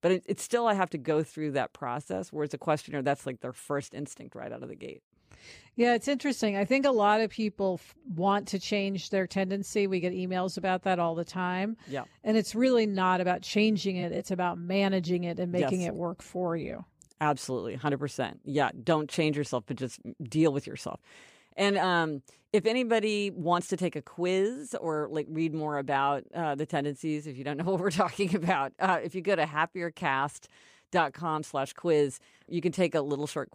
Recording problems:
none

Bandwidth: 15 kHz